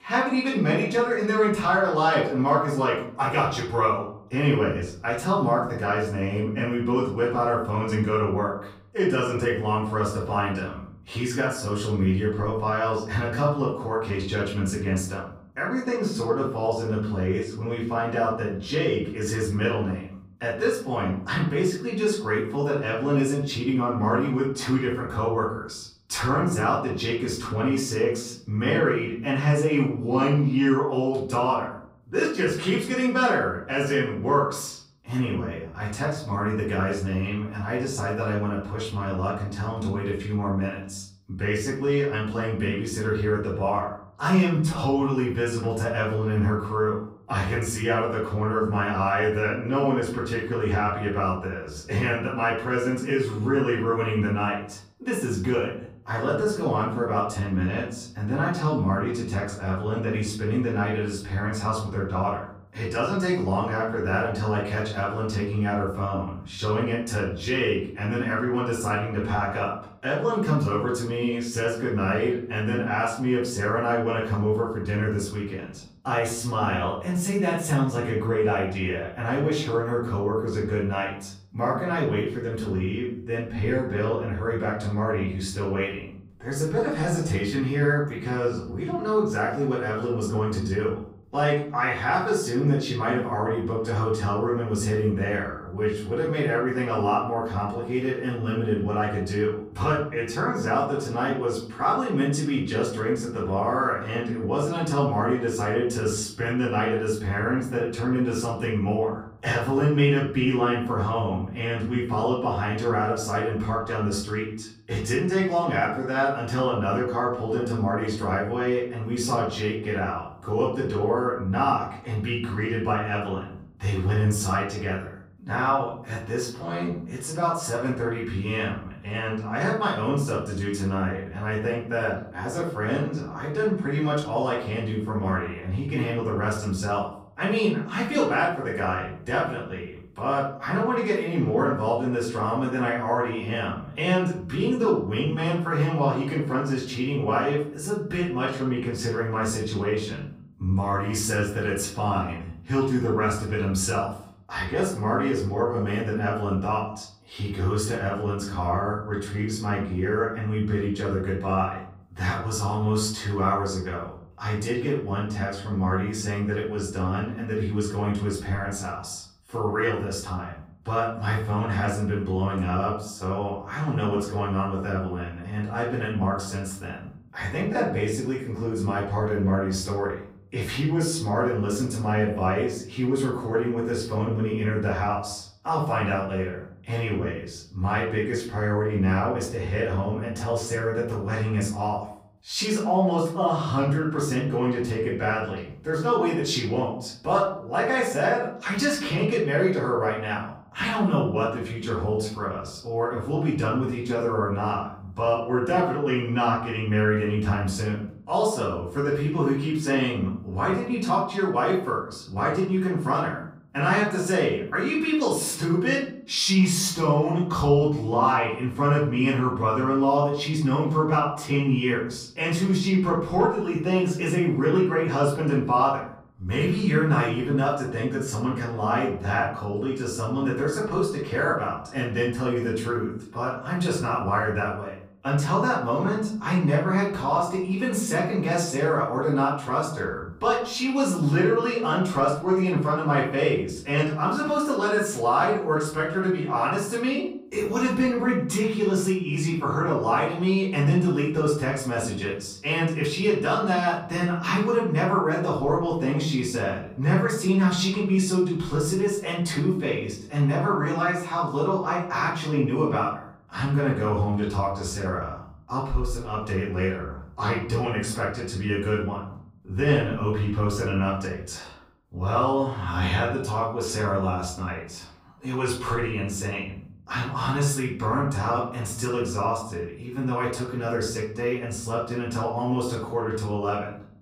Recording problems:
off-mic speech; far
room echo; noticeable; dies away in 0.6 s

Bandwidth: 15.5 kHz